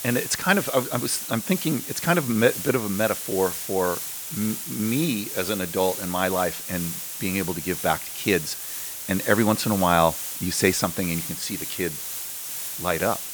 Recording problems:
hiss; loud; throughout; 5 dB below the speech

